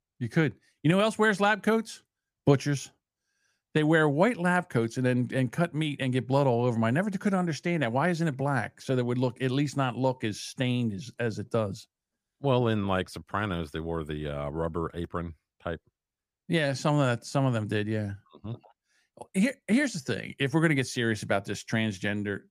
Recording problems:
none

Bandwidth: 15 kHz